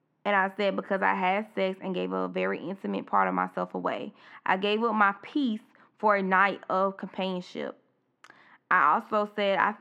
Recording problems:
muffled; slightly; fading above 2.5 kHz

